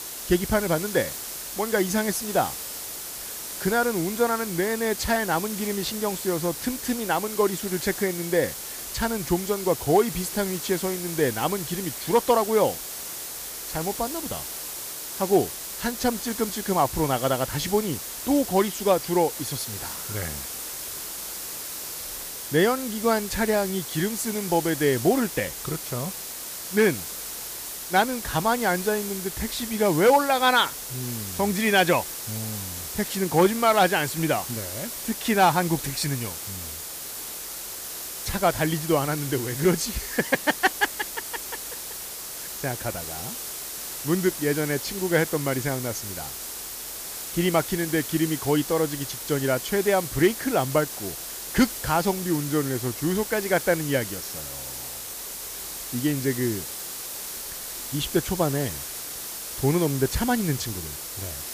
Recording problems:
hiss; loud; throughout; 7 dB below the speech

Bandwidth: 15 kHz